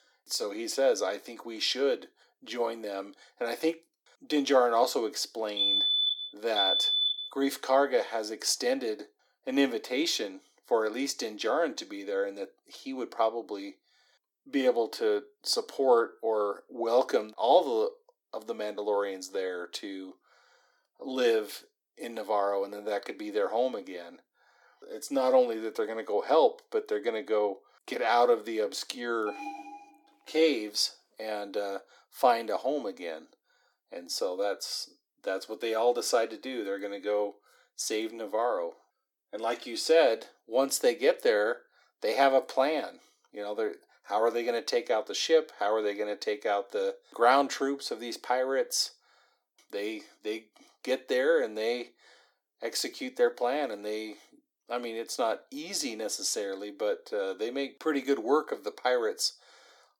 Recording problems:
thin; somewhat; fading below 350 Hz
alarm; loud; from 5.5 to 7.5 s; peak 7 dB above the speech
alarm; faint; at 29 s; peak 10 dB below the speech

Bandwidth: 18 kHz